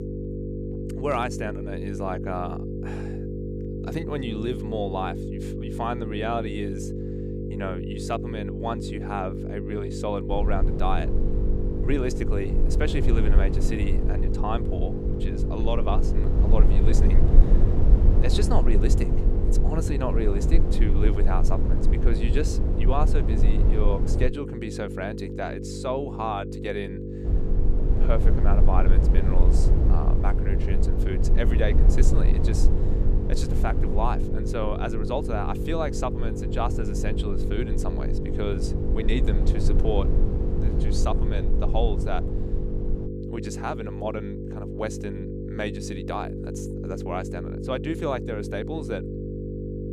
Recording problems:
electrical hum; loud; throughout; 50 Hz, 5 dB below the speech
low rumble; loud; from 10 to 24 s and from 27 to 43 s; 8 dB below the speech

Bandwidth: 14.5 kHz